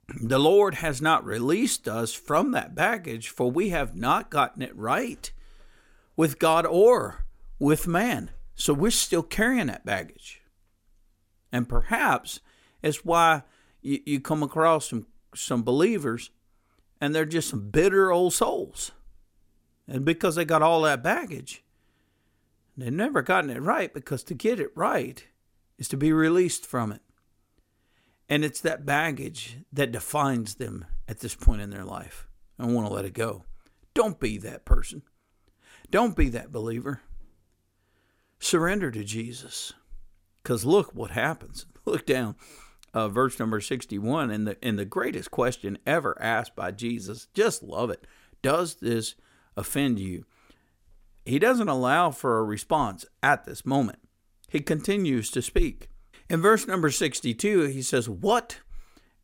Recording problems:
none

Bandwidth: 16.5 kHz